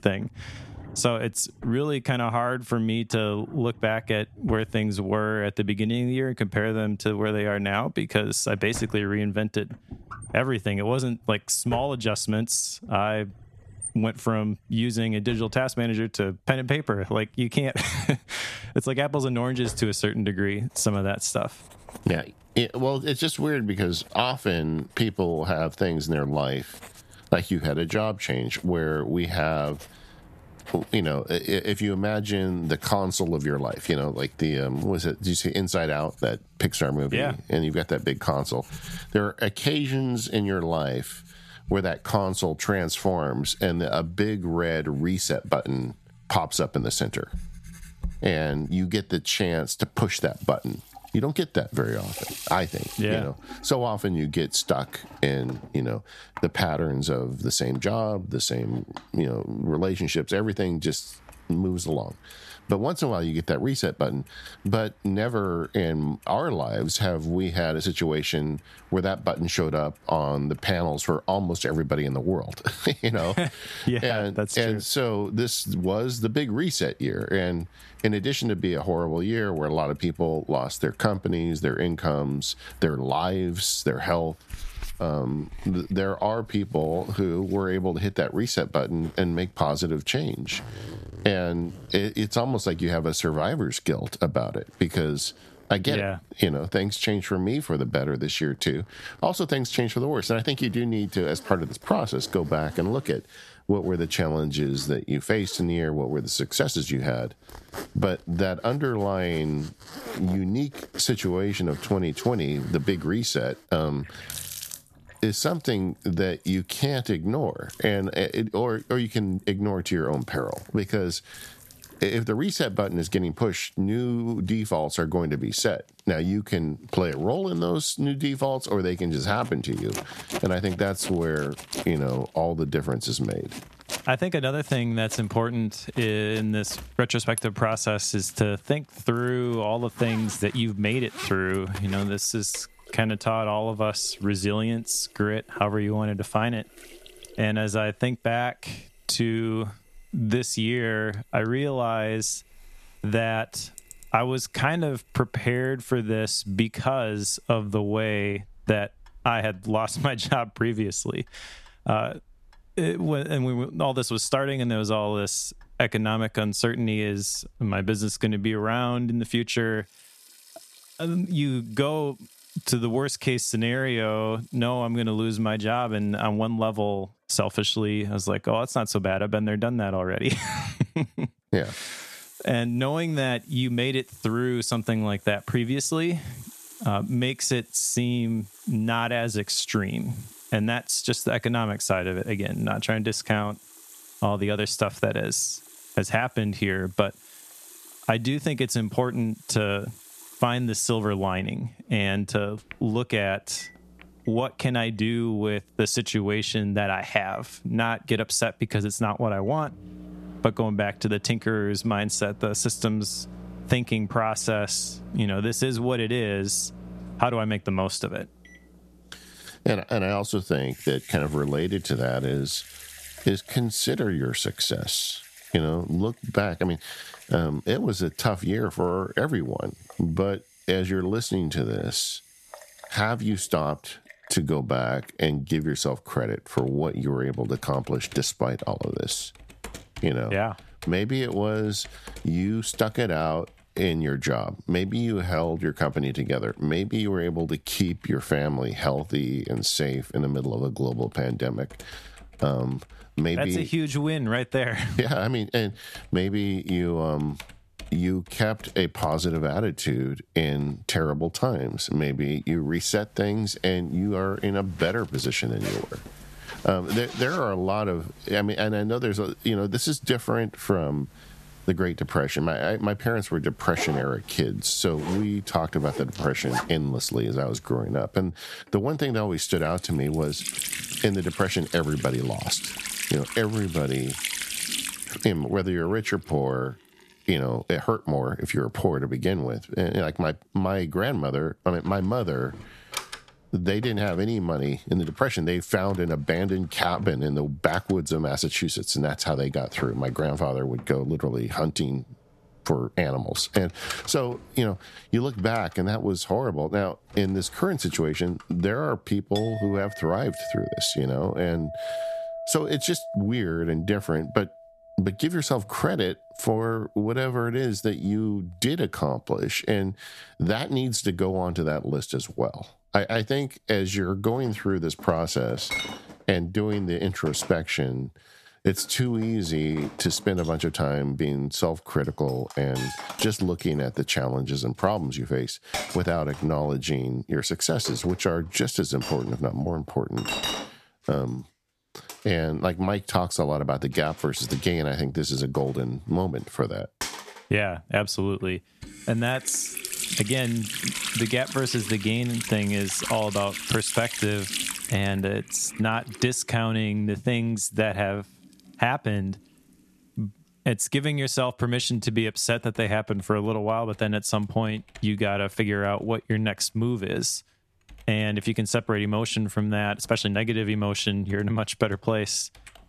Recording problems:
squashed, flat; somewhat, background pumping
household noises; noticeable; throughout; 15 dB below the speech

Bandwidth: 14 kHz